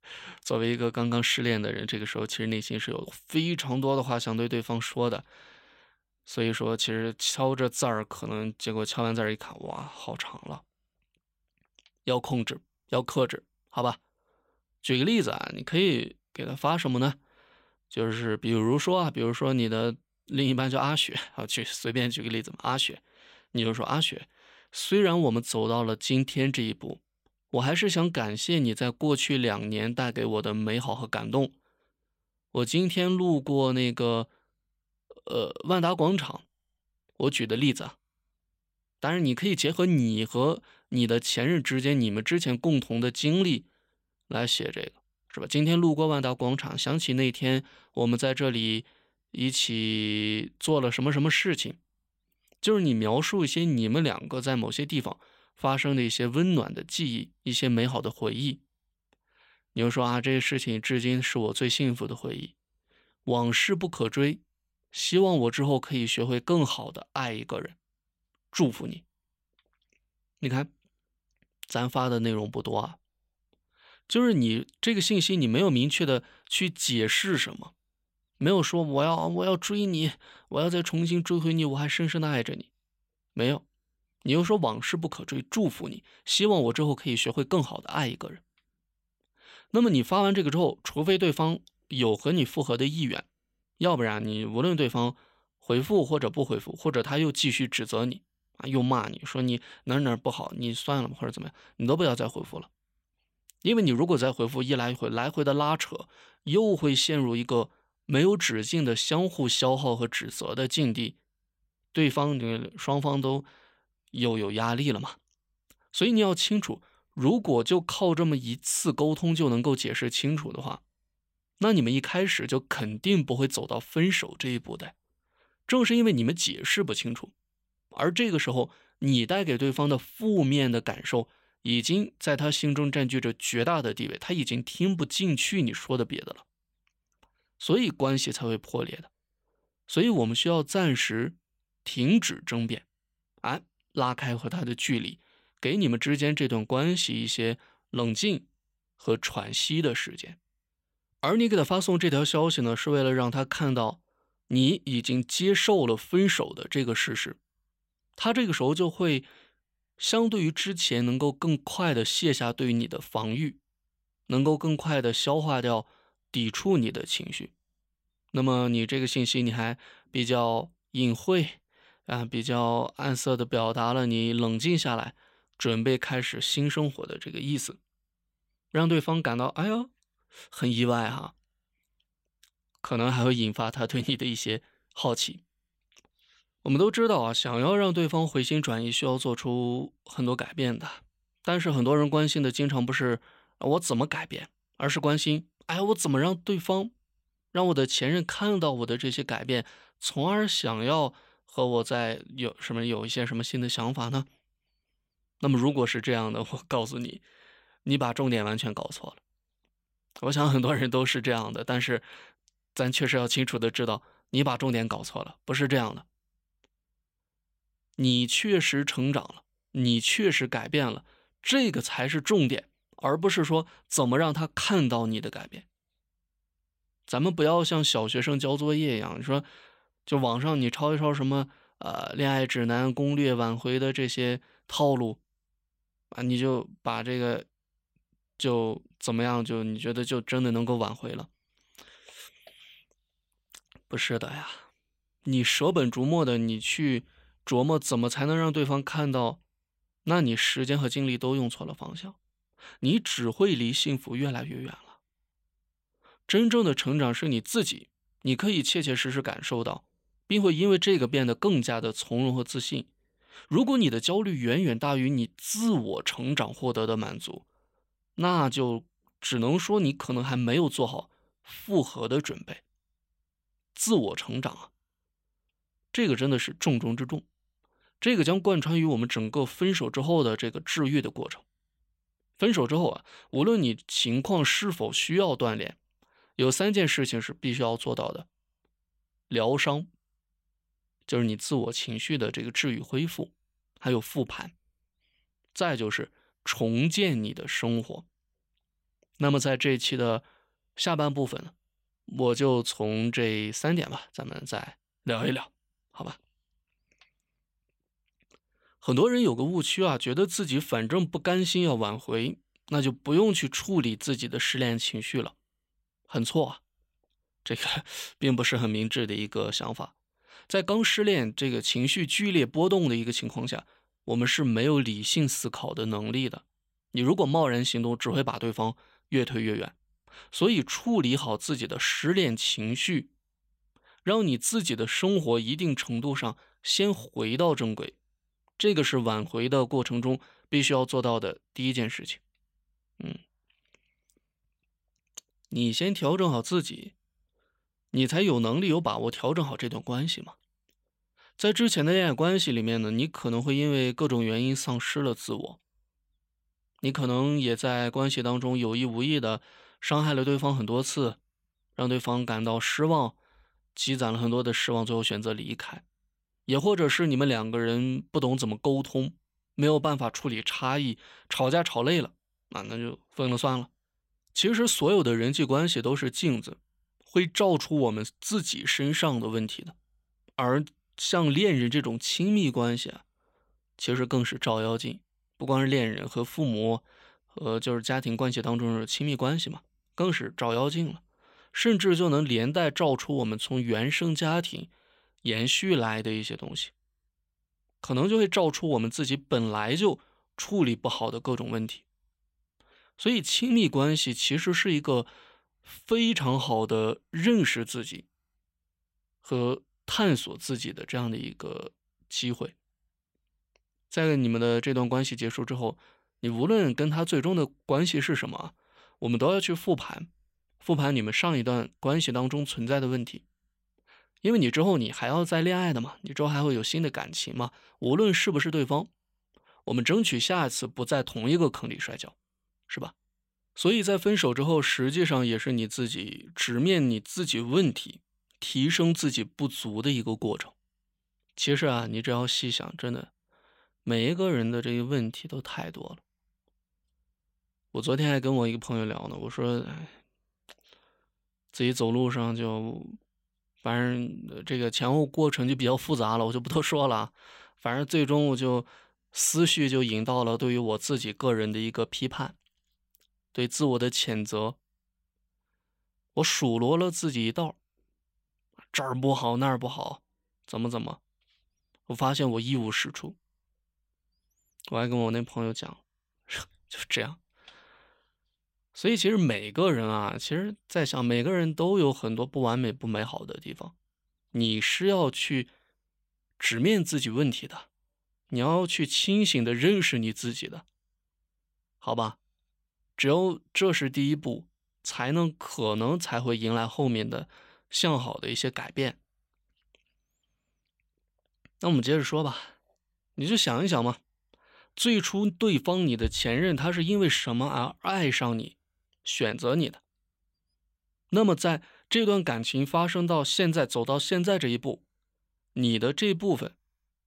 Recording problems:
none

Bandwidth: 16 kHz